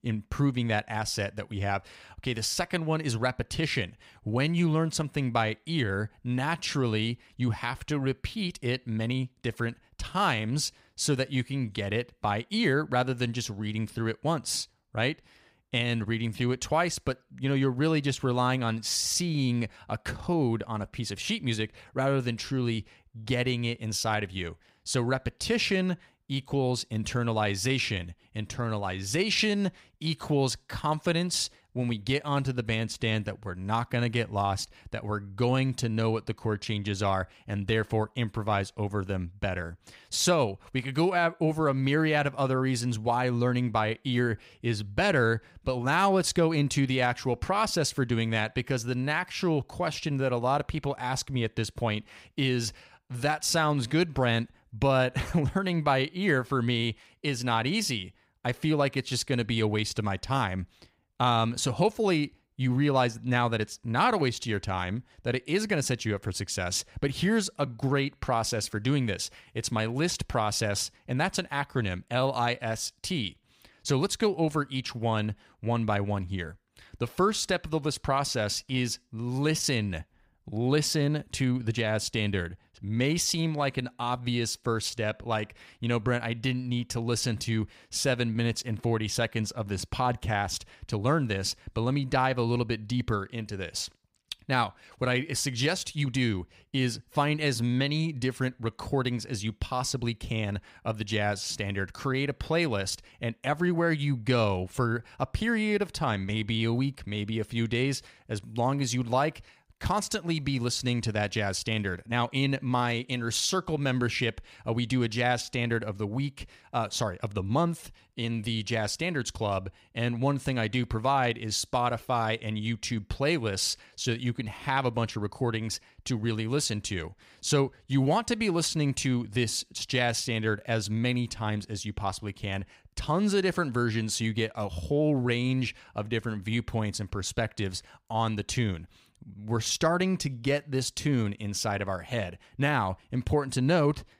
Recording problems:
none

